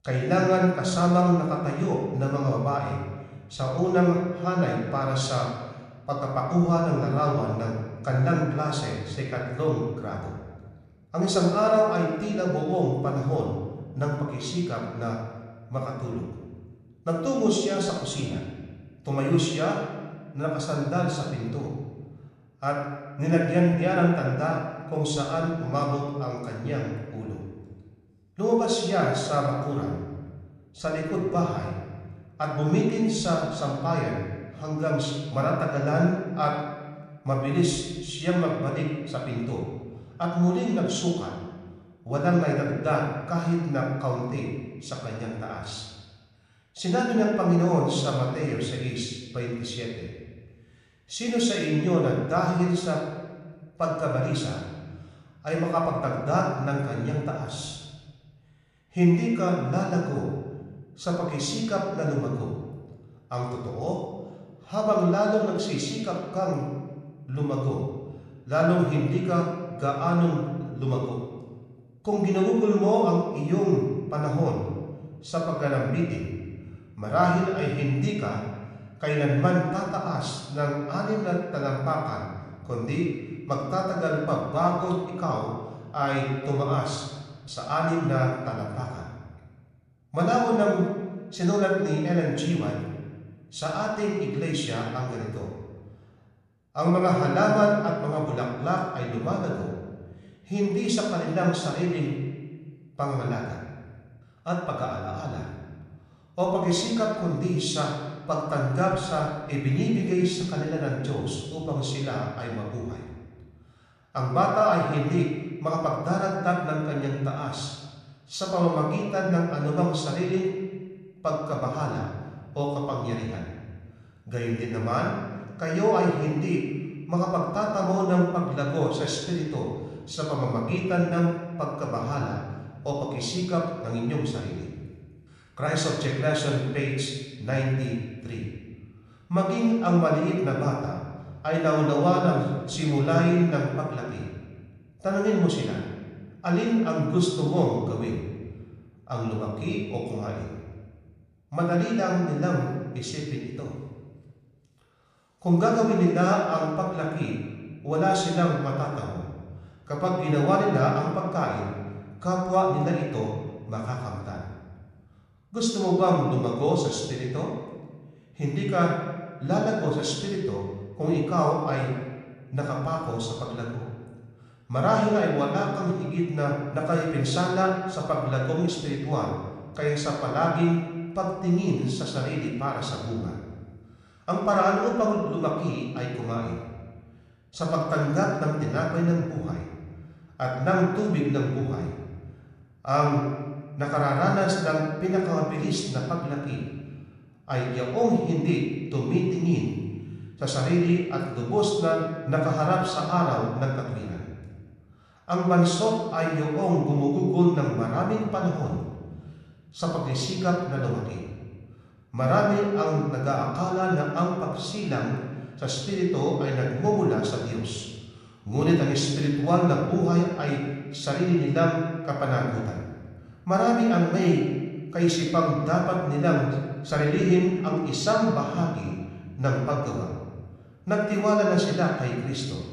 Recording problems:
room echo; noticeable; dies away in 1.3 s
off-mic speech; somewhat distant

